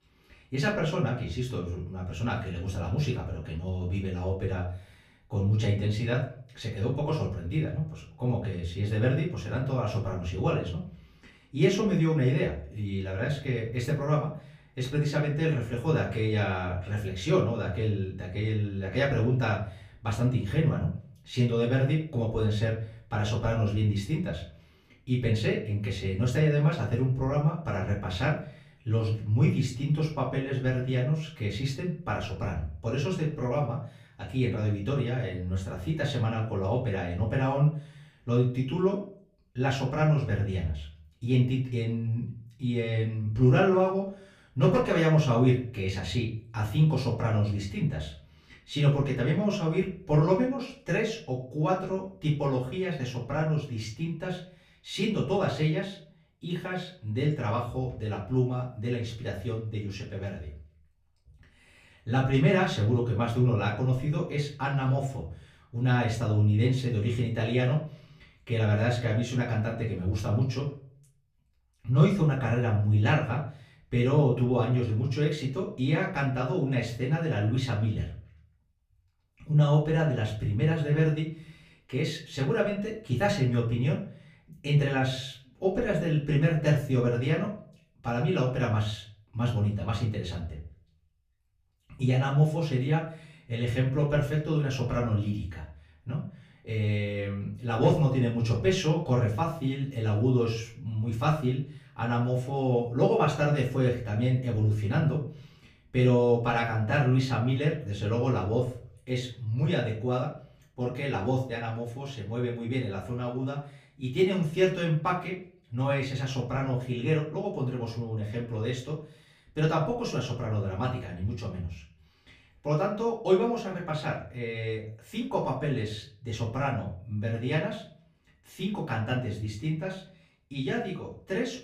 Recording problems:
off-mic speech; far
room echo; slight; dies away in 0.4 s

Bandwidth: 15 kHz